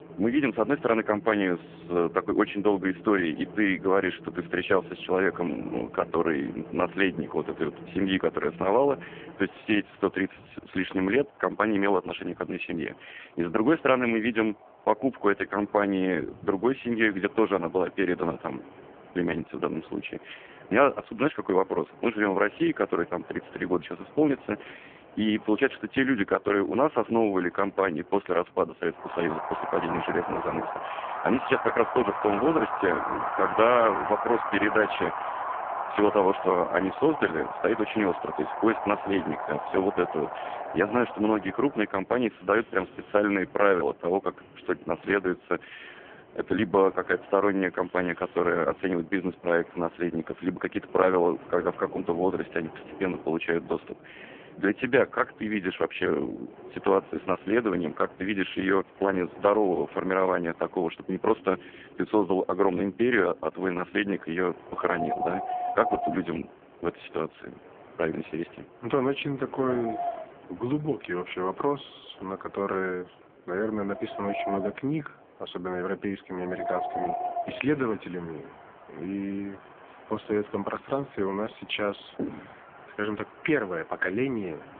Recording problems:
phone-call audio; poor line
wind in the background; loud; throughout; 9 dB below the speech

